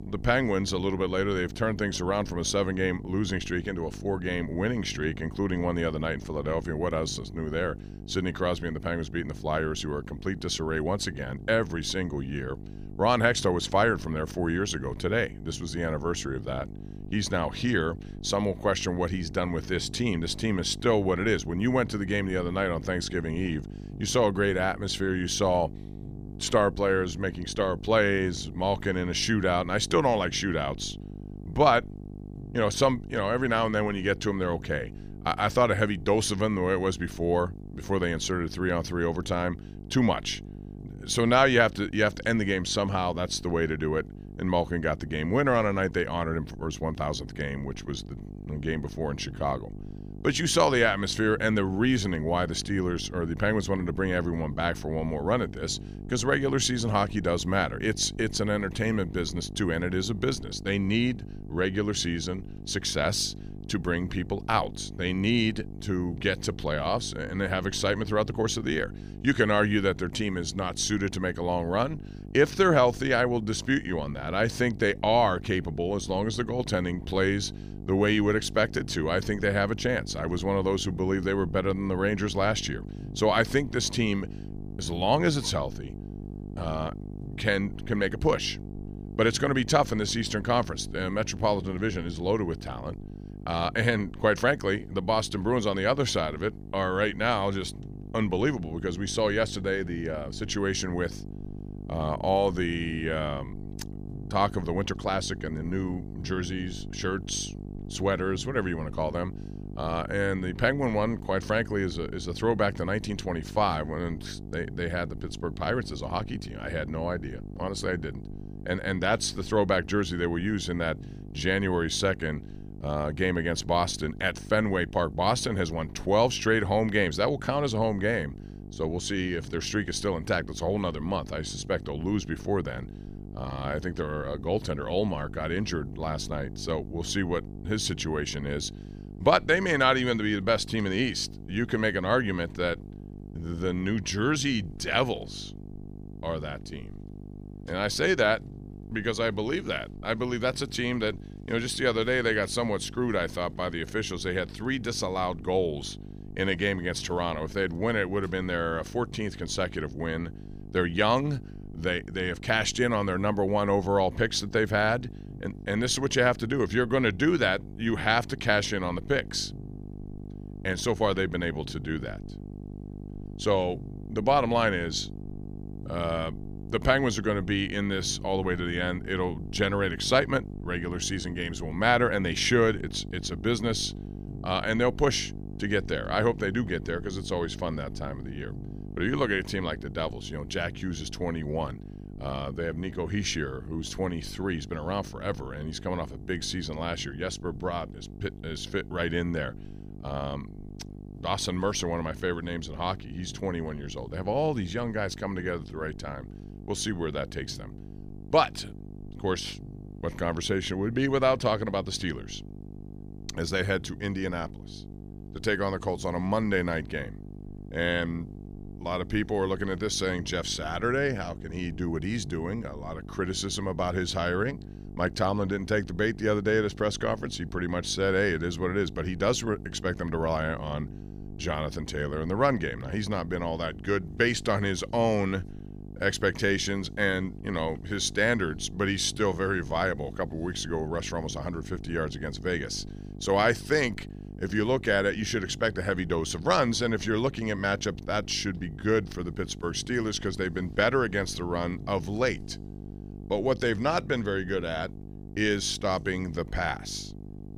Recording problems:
electrical hum; faint; throughout; 50 Hz, 20 dB below the speech

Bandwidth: 15 kHz